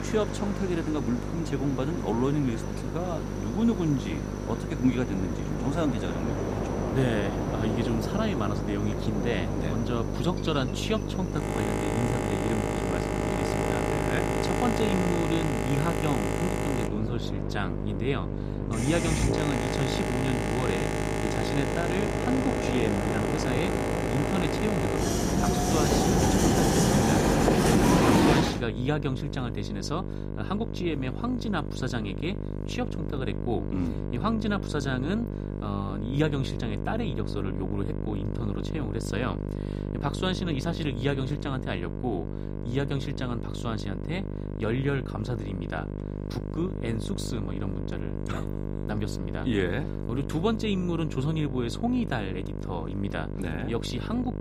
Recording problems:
train or aircraft noise; very loud; until 28 s; 3 dB above the speech
electrical hum; loud; throughout; 50 Hz, 6 dB below the speech

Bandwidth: 15.5 kHz